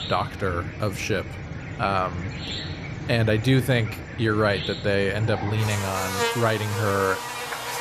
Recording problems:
animal sounds; loud; throughout; 7 dB below the speech

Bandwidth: 14.5 kHz